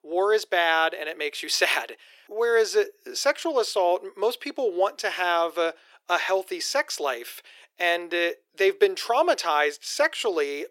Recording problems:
thin; very; fading below 350 Hz

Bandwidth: 16.5 kHz